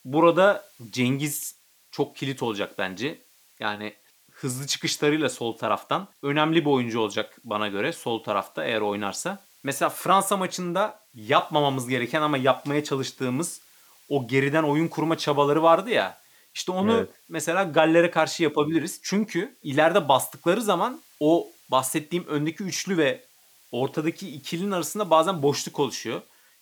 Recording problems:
hiss; faint; throughout; 30 dB below the speech

